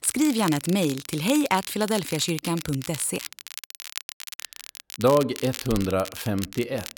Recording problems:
crackle, like an old record; noticeable; 10 dB below the speech

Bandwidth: 17.5 kHz